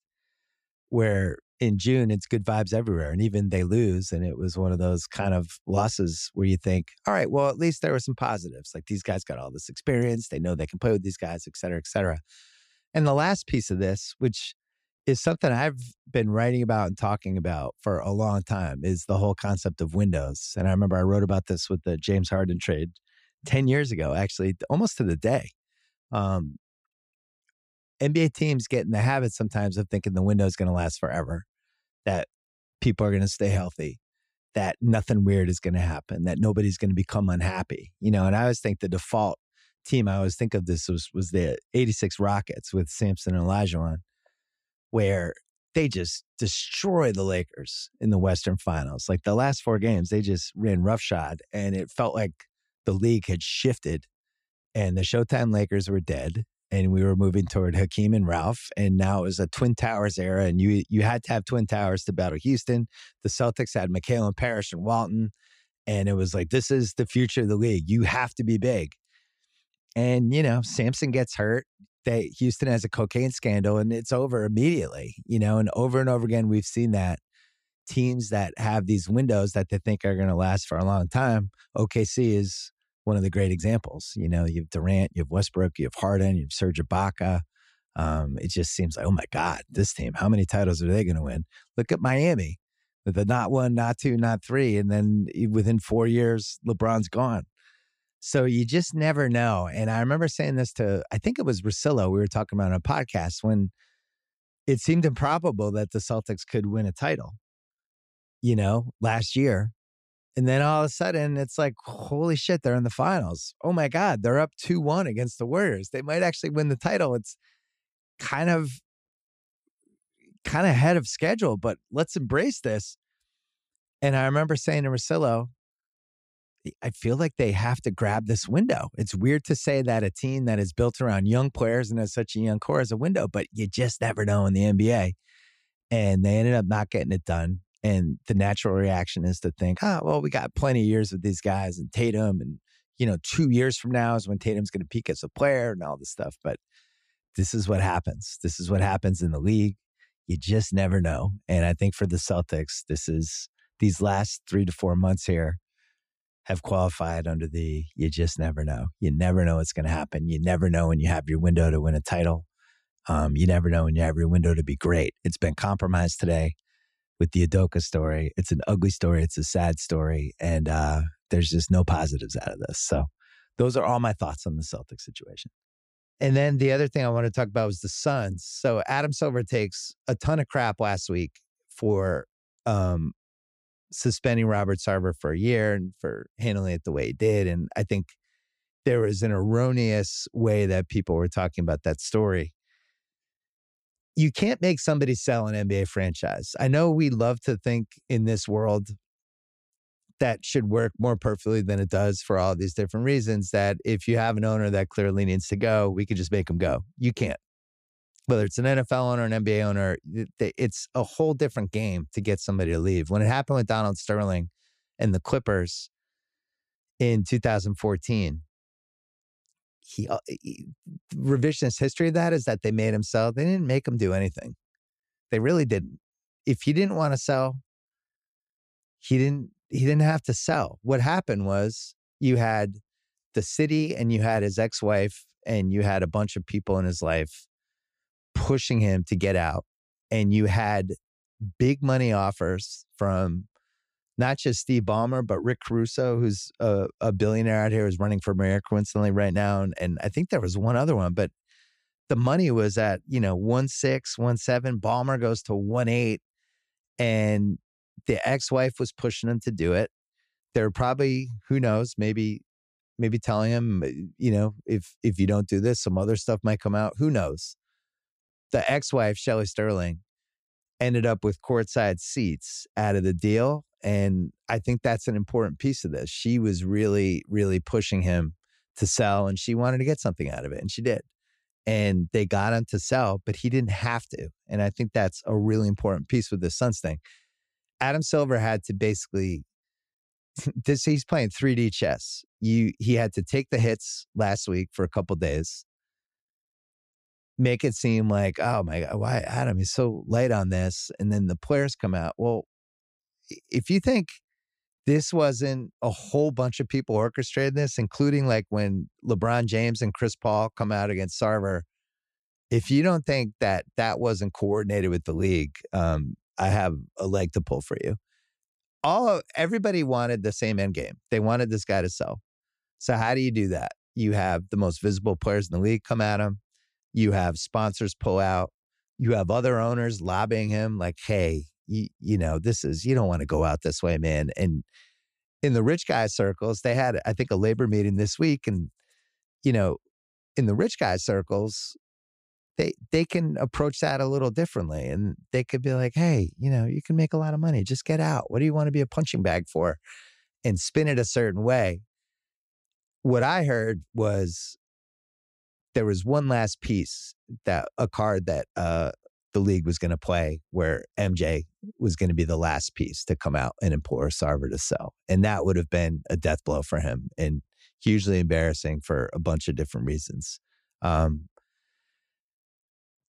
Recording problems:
none

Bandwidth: 15 kHz